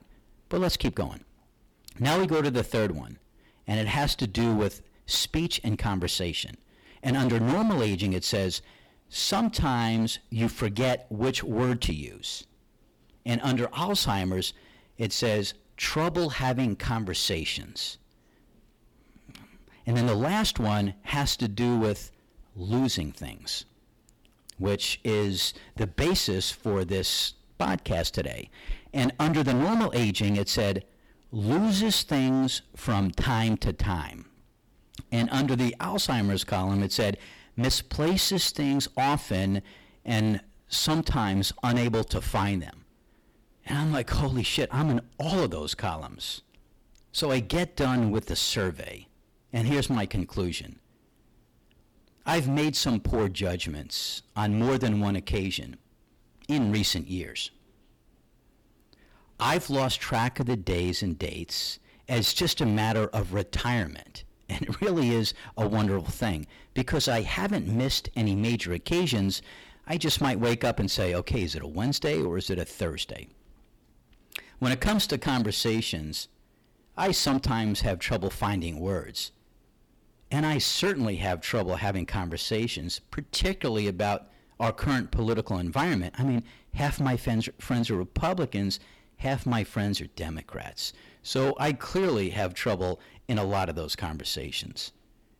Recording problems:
distortion; heavy; 11% of the sound clipped

